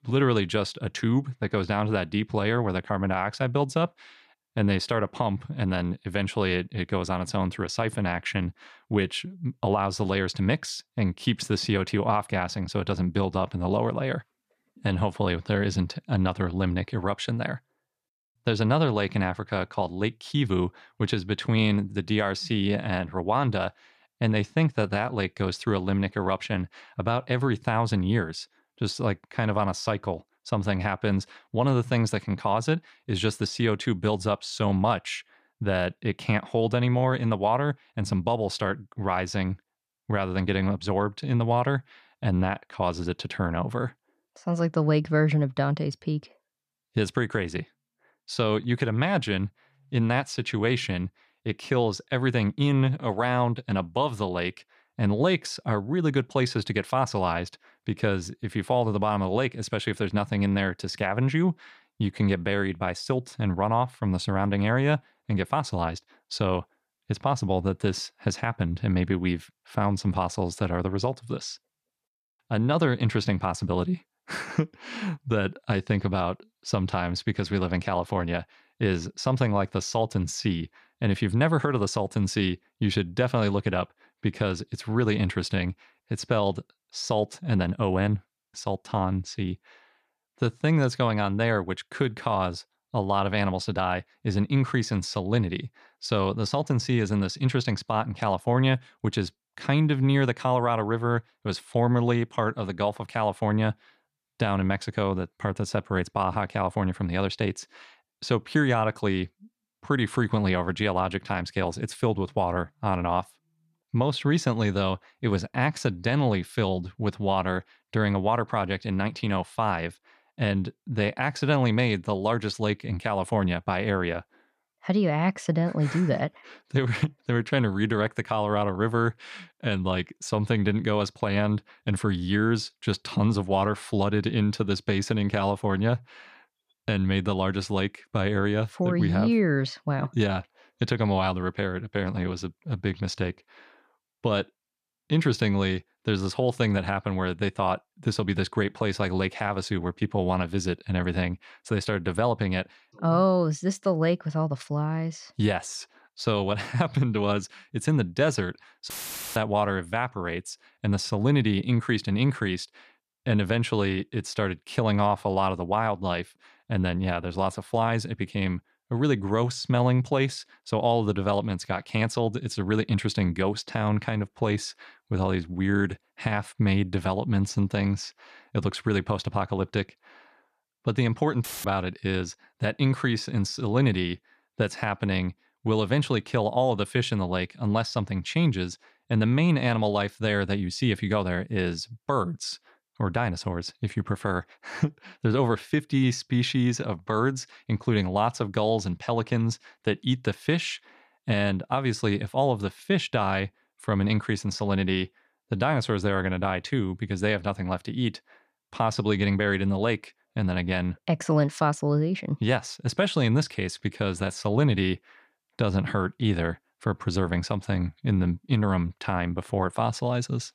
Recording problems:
audio cutting out; filled with static; at 2:39 and at 3:01

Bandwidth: 14.5 kHz